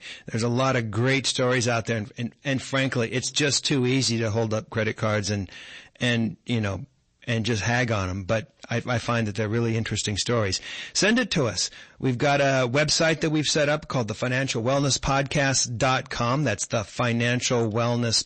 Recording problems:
distortion; slight; 10 dB below the speech
garbled, watery; slightly; nothing above 8 kHz

